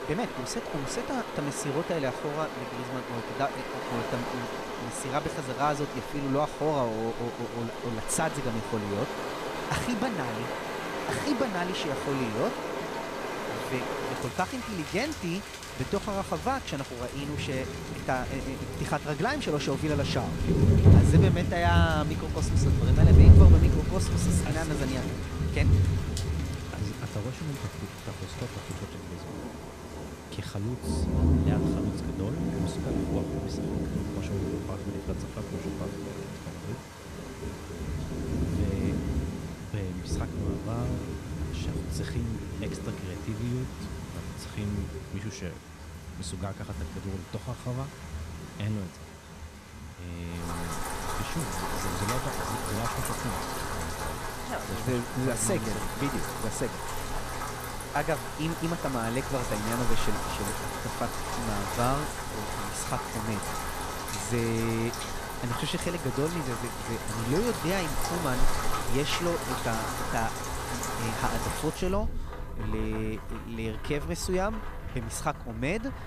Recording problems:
rain or running water; very loud; throughout; 3 dB above the speech

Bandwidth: 14.5 kHz